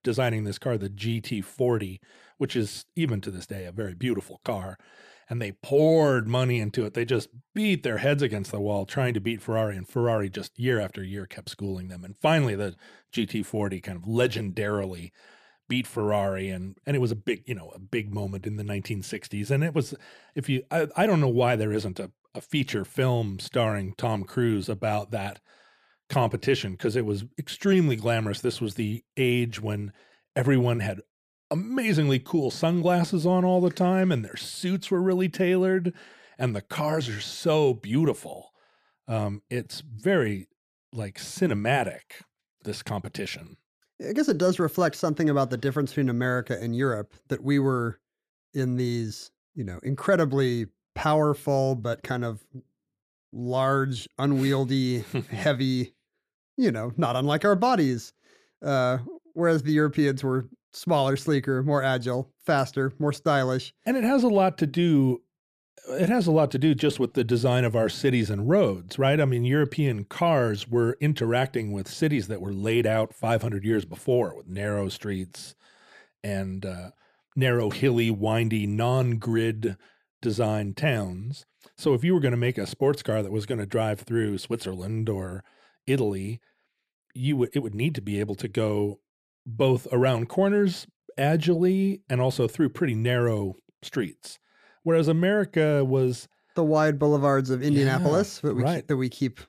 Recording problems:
none

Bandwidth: 14.5 kHz